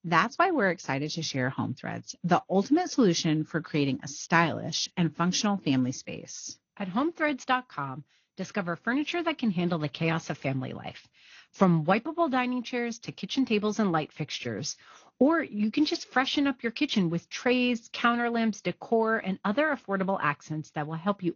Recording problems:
garbled, watery; slightly; nothing above 6.5 kHz

